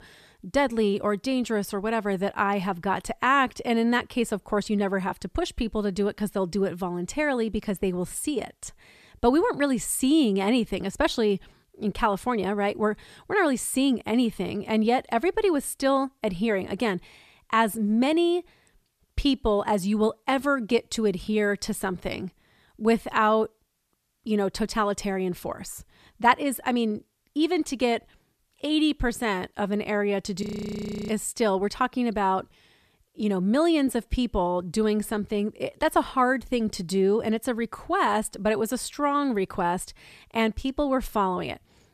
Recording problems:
audio freezing; at 30 s for 0.5 s

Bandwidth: 14.5 kHz